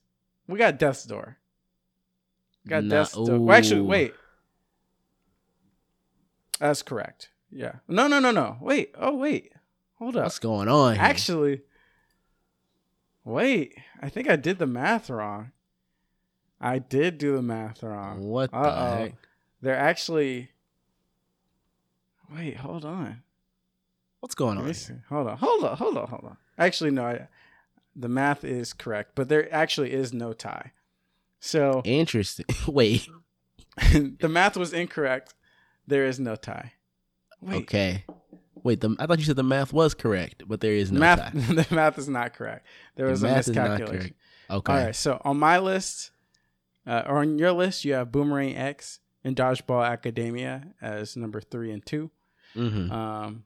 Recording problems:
none

